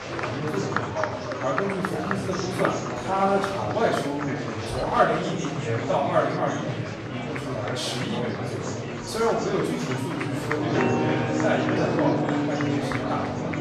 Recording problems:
off-mic speech; far
room echo; noticeable; dies away in 0.7 s
background music; very loud; throughout; 1 dB above the speech
murmuring crowd; loud; throughout; 3 dB below the speech

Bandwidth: 14 kHz